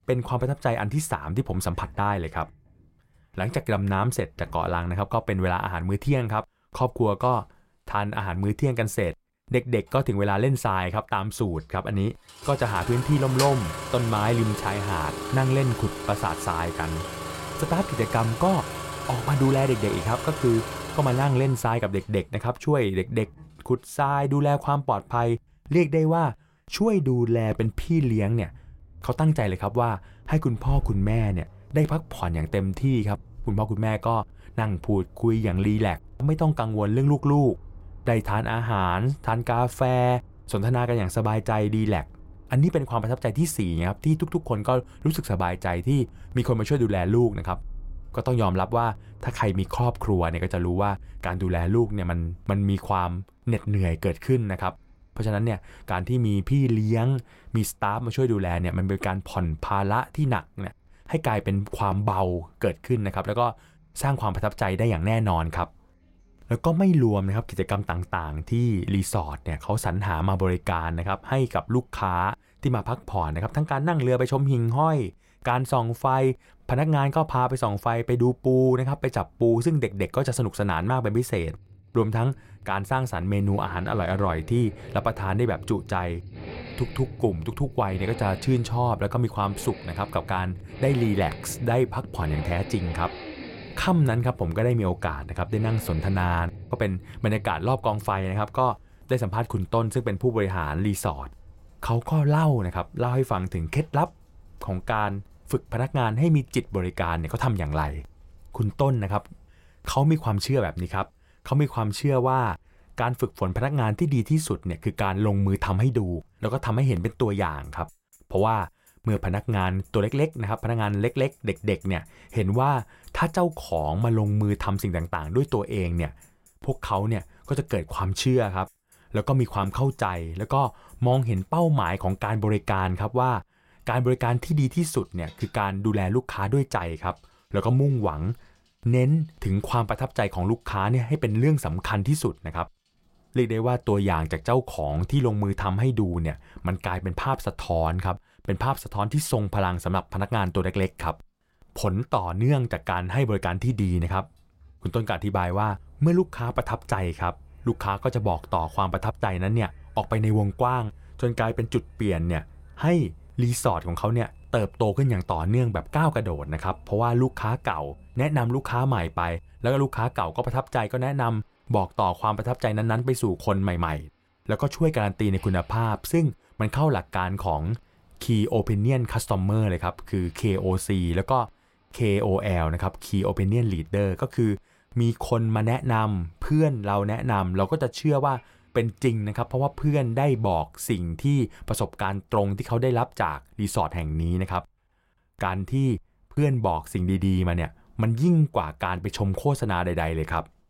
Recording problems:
traffic noise; noticeable; throughout; 15 dB below the speech

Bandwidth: 16 kHz